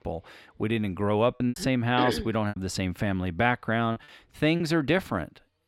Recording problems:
choppy; very; 6% of the speech affected

